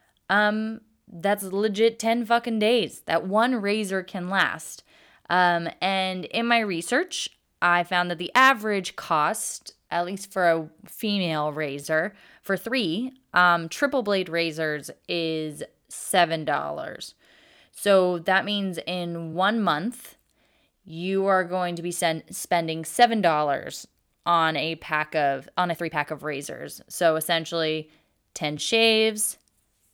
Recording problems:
uneven, jittery; strongly; from 1 to 29 s

